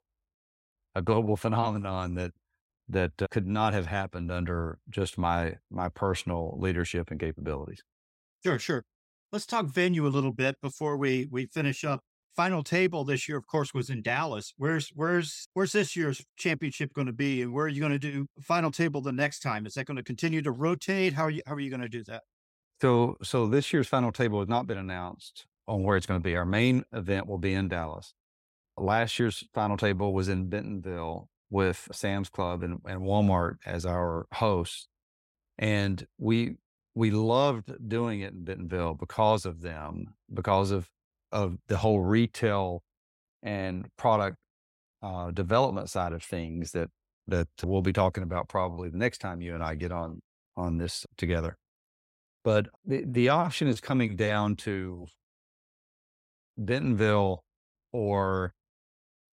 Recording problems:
none

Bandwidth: 16 kHz